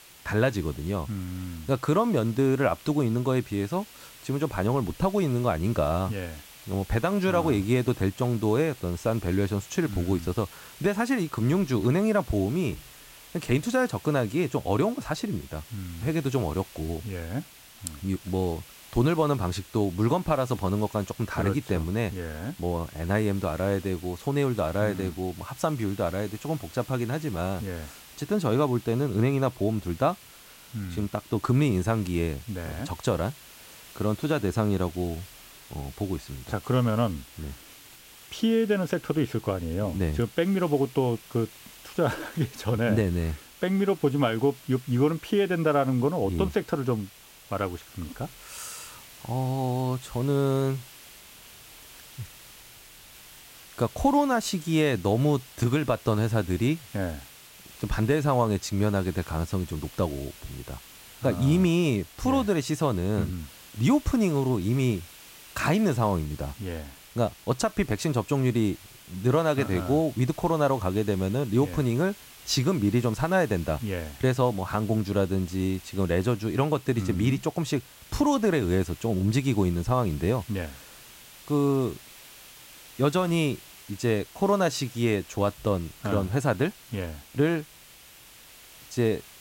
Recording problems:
hiss; noticeable; throughout; 20 dB below the speech

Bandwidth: 16 kHz